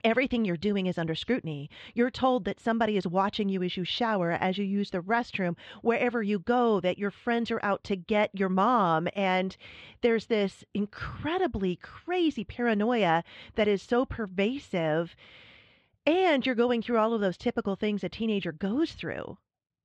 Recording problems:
muffled; very; fading above 3.5 kHz

